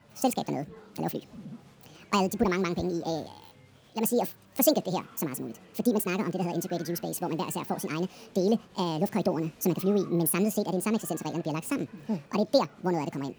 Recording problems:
wrong speed and pitch; too fast and too high; 1.7 times normal speed
murmuring crowd; faint; throughout; 25 dB below the speech

